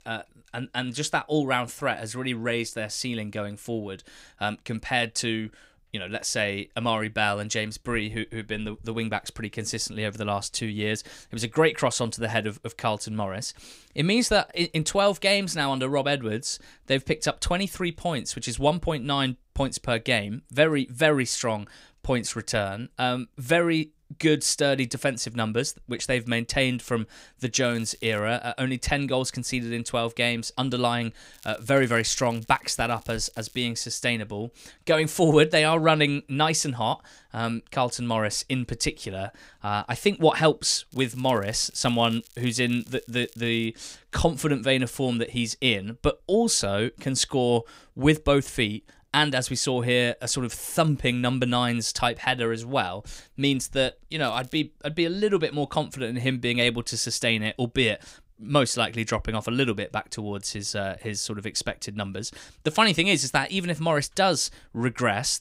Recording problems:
crackling; faint; 4 times, first at 28 s; 25 dB below the speech

